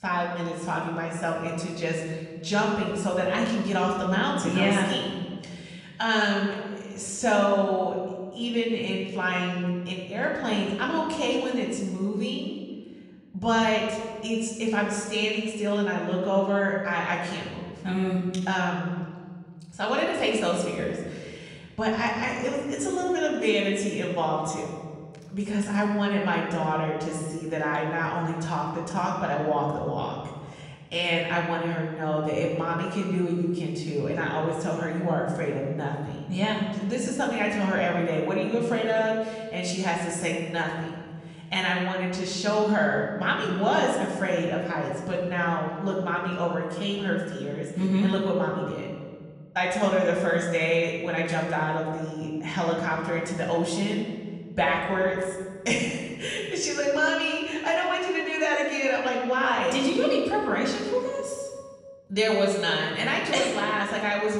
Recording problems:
off-mic speech; far
room echo; noticeable; dies away in 1.7 s

